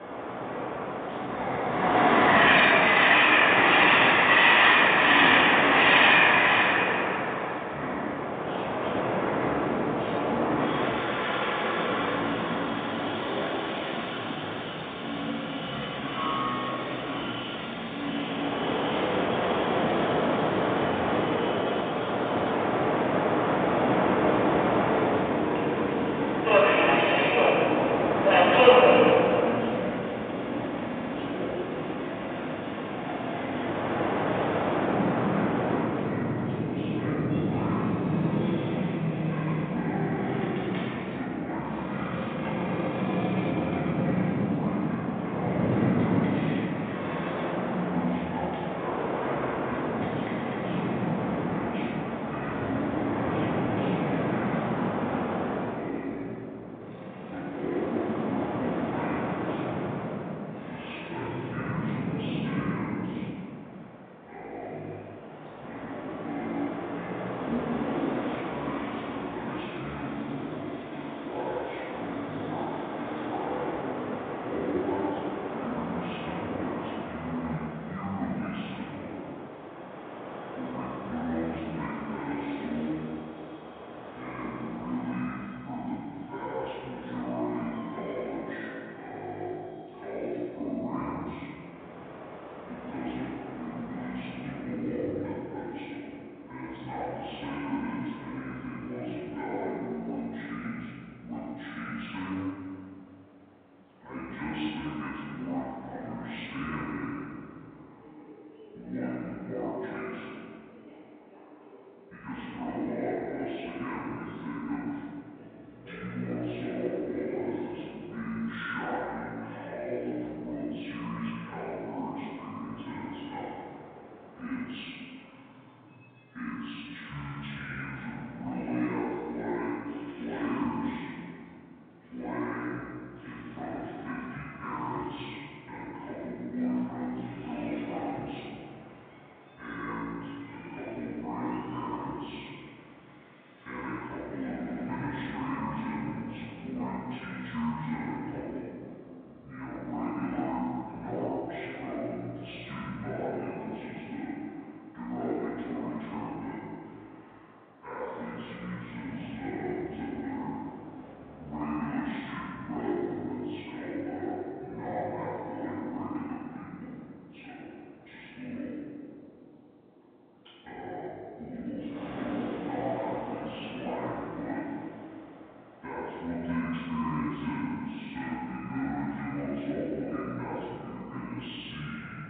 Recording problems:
room echo; strong; dies away in 2.1 s
off-mic speech; far
wrong speed and pitch; too slow and too low; 0.6 times normal speed
phone-call audio; nothing above 3.5 kHz
train or aircraft noise; very loud; throughout; 10 dB above the speech
audio stuttering; at 31 s and at 2:25

